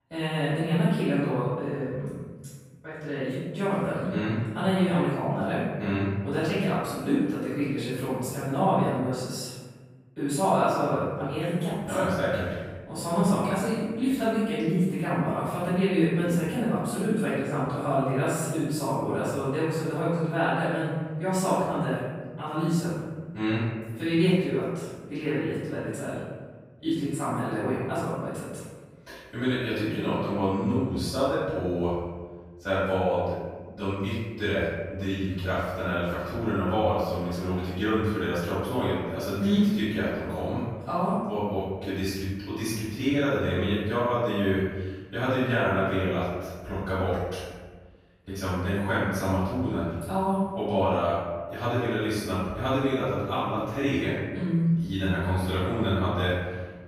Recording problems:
room echo; strong; dies away in 1.4 s
off-mic speech; far

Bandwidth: 15.5 kHz